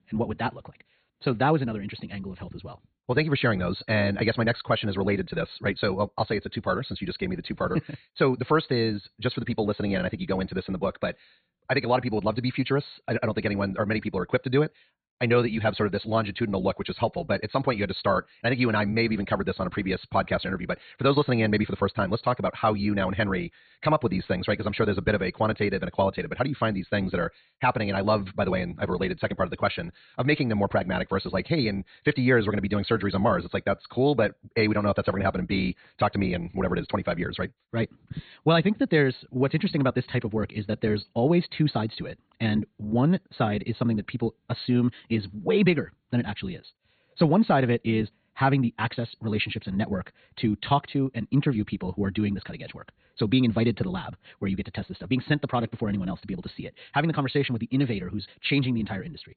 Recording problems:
high frequencies cut off; severe; nothing above 4.5 kHz
wrong speed, natural pitch; too fast; 1.5 times normal speed

